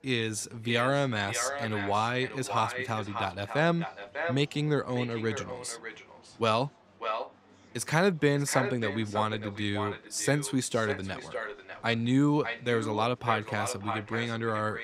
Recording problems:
echo of what is said; strong; throughout; 600 ms later, 8 dB below the speech
murmuring crowd; faint; throughout; 30 dB below the speech

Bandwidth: 15.5 kHz